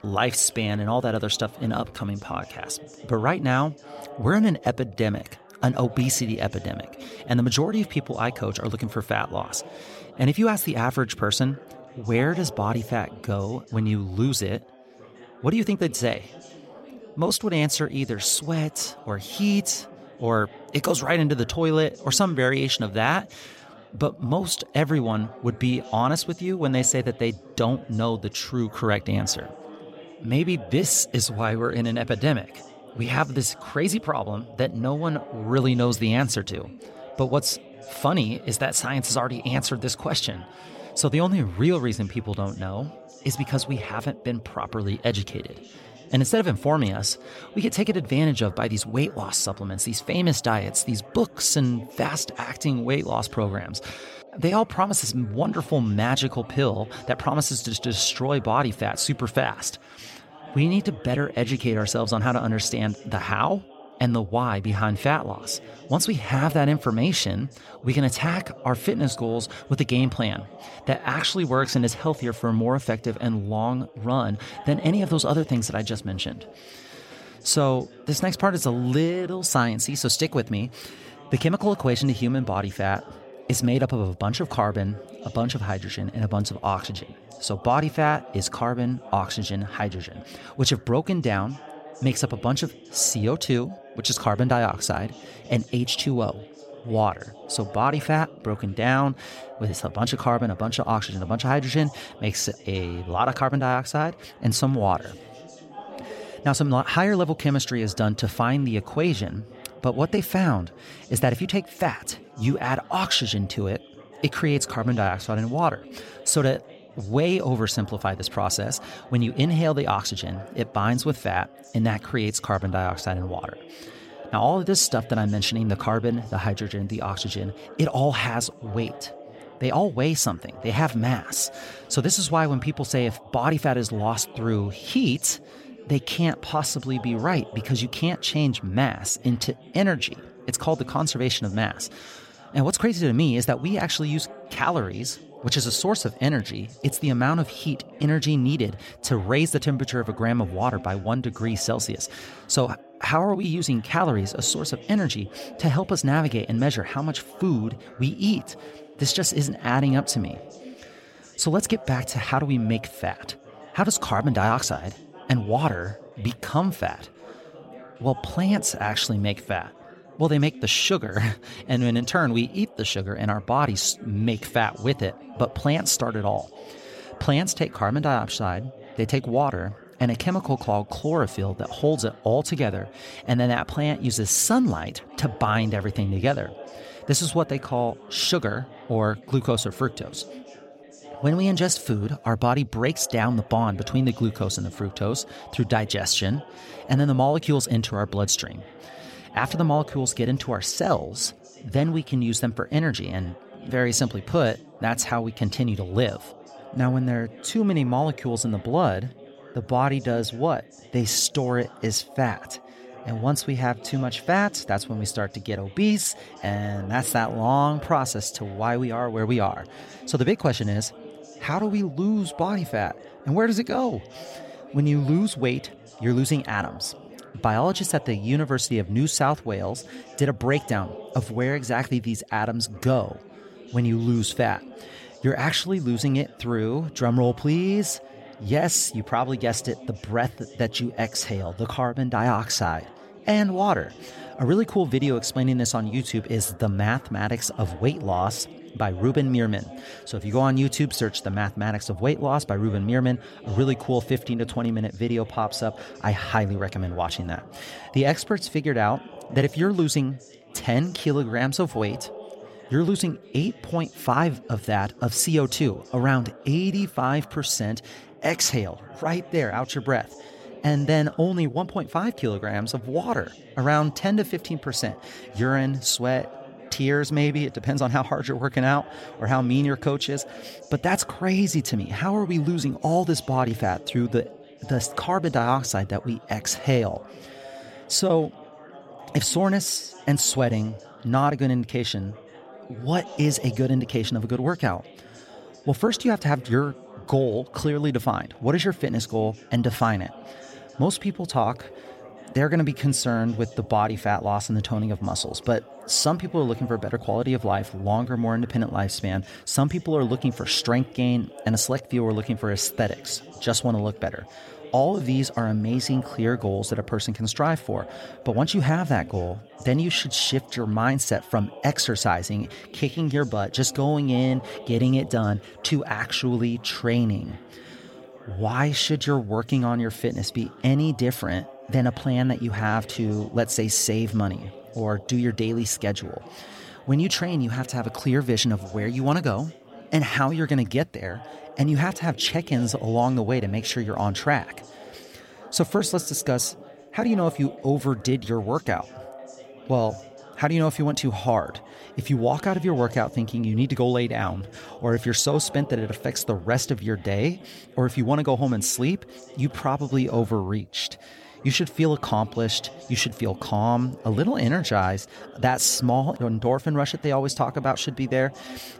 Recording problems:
background chatter; noticeable; throughout; 3 voices, 20 dB below the speech

